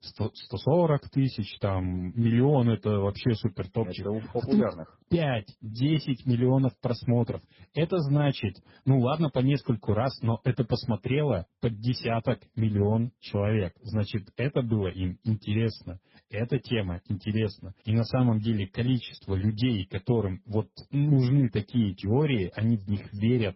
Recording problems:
garbled, watery; badly; nothing above 5.5 kHz

